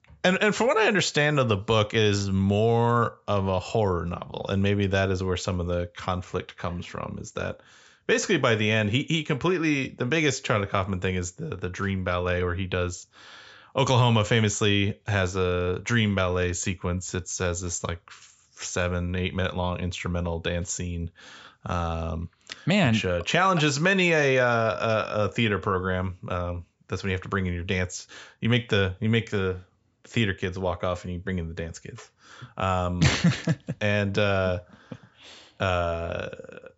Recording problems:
high frequencies cut off; noticeable; nothing above 8 kHz

